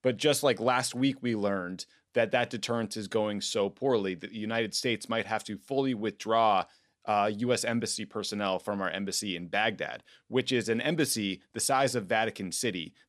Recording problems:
none

